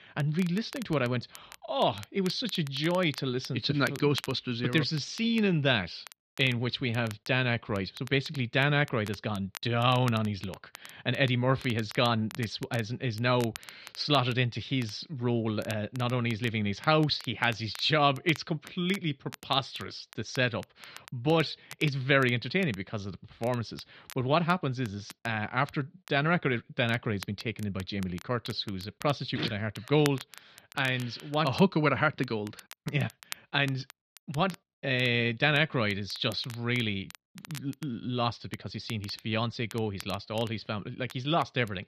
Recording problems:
muffled; slightly; fading above 4 kHz
crackle, like an old record; noticeable; 20 dB below the speech

